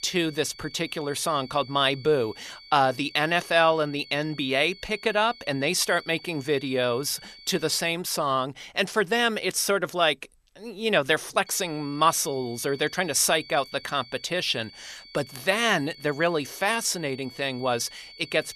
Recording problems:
high-pitched whine; noticeable; until 8 s and from 11 s on; 4.5 kHz, 20 dB below the speech

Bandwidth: 13.5 kHz